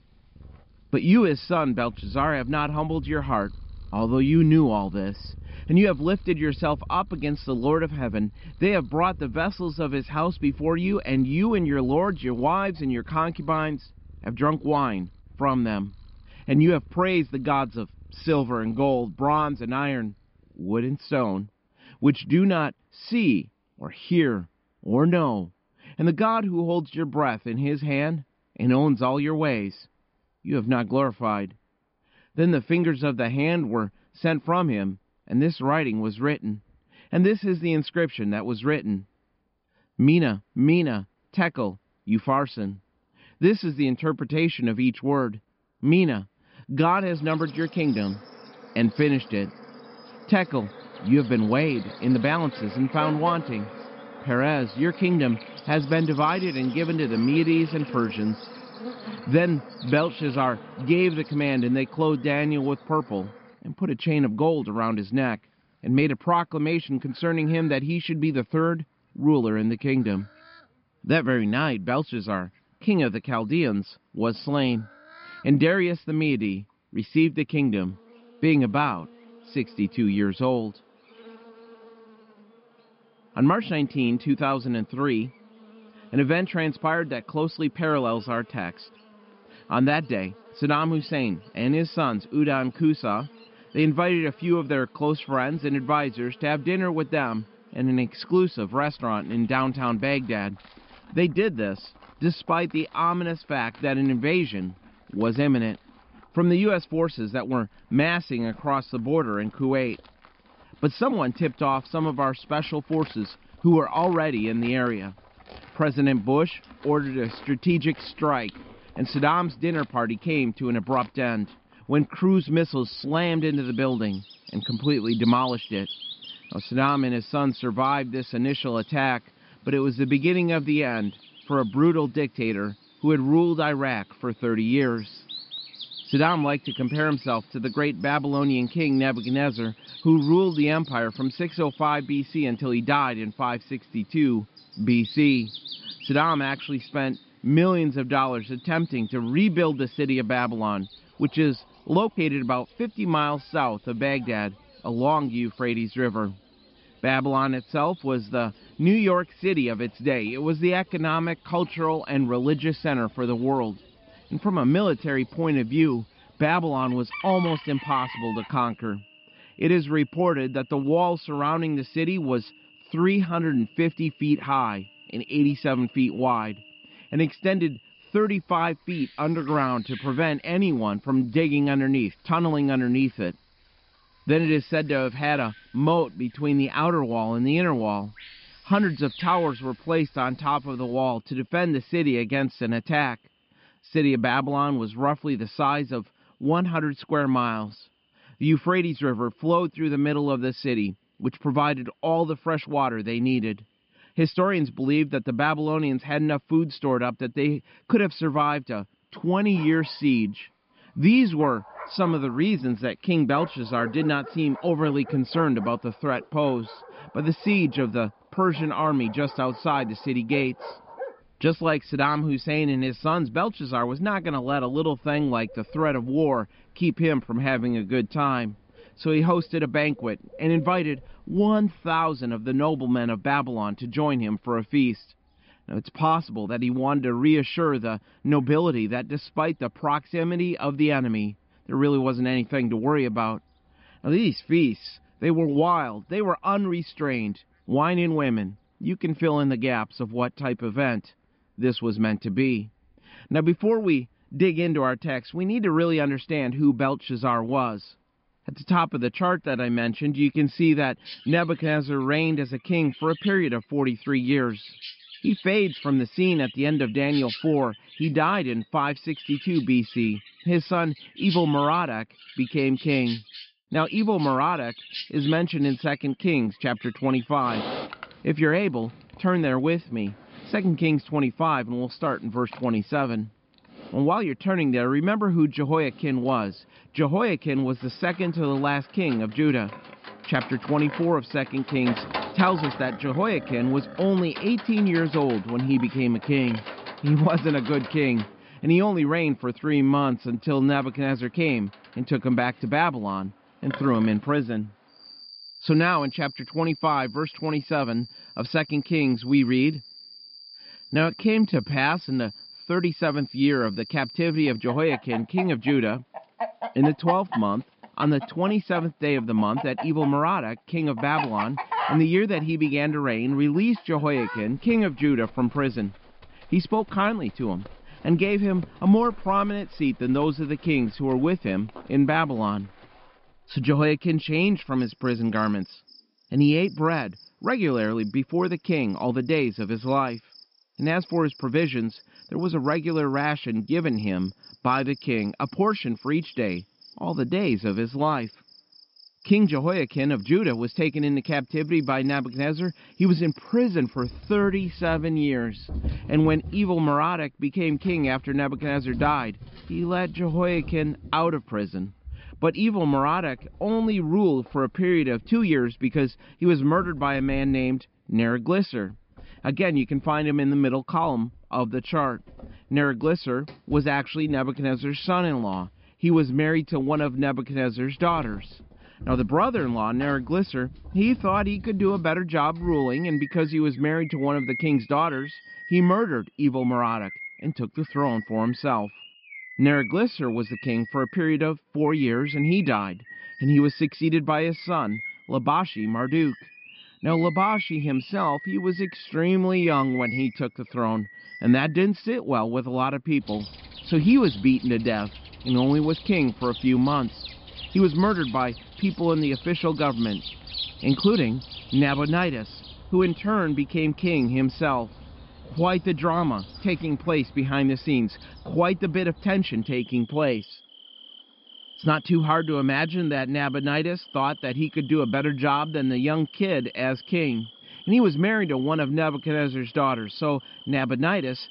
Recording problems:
high frequencies cut off; noticeable; nothing above 5 kHz
animal sounds; noticeable; throughout; 15 dB below the speech
uneven, jittery; strongly; from 5:00 to 6:01

